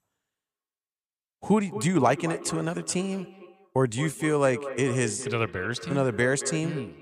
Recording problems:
echo of what is said; strong; throughout; 220 ms later, 10 dB below the speech

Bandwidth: 15 kHz